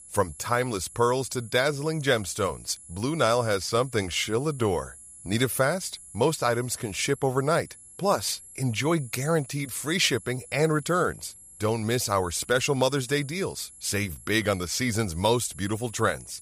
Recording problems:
high-pitched whine; noticeable; throughout; 11 kHz, 20 dB below the speech

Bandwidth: 15 kHz